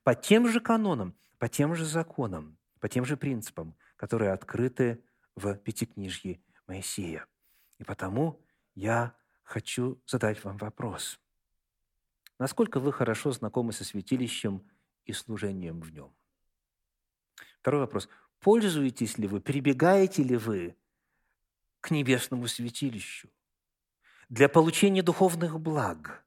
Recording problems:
none

